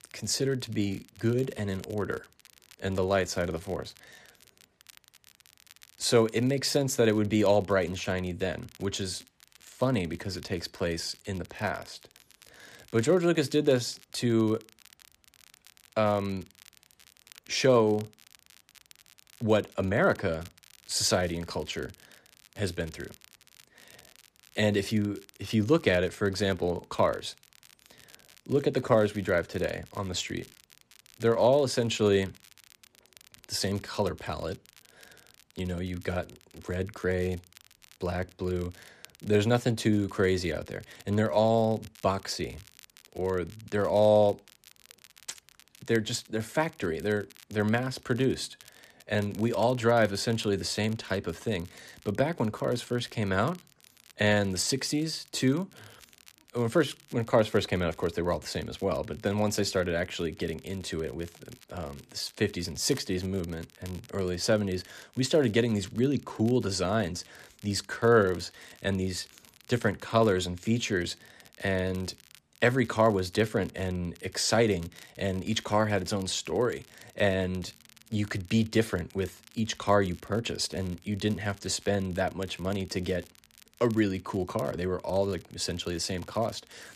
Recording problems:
crackle, like an old record; faint; 25 dB below the speech

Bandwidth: 14.5 kHz